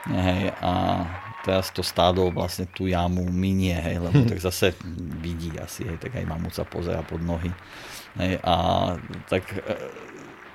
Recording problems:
crowd noise; noticeable; throughout; 15 dB below the speech

